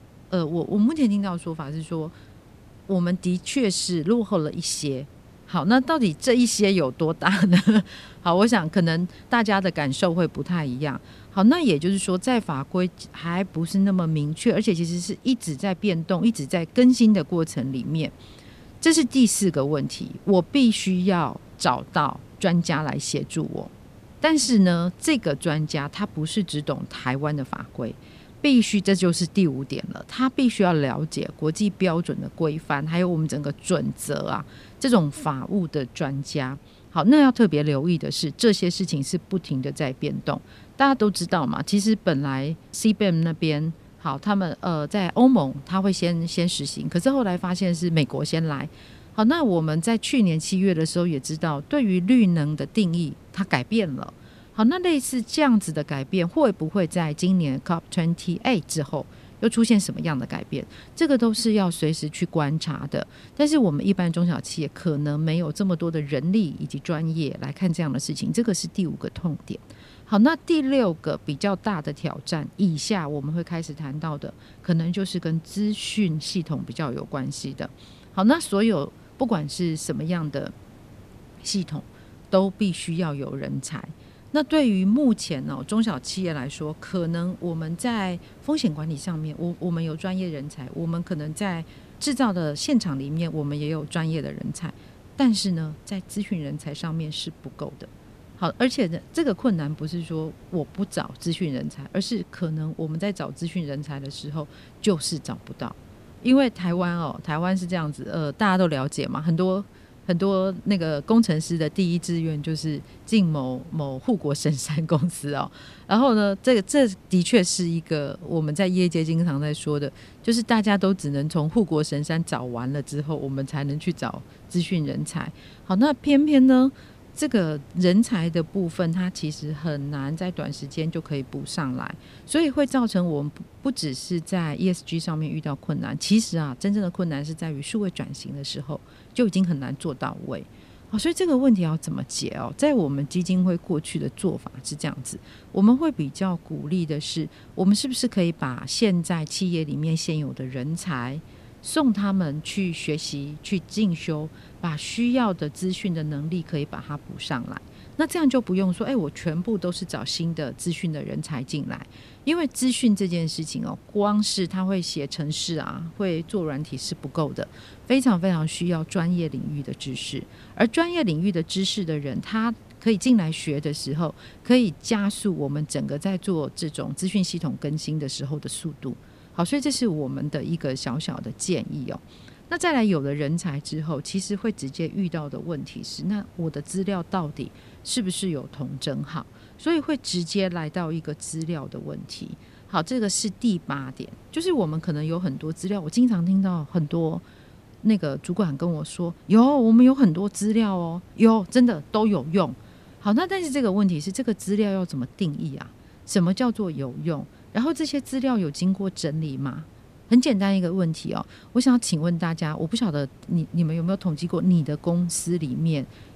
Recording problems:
hiss; faint; throughout; 25 dB below the speech

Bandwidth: 14.5 kHz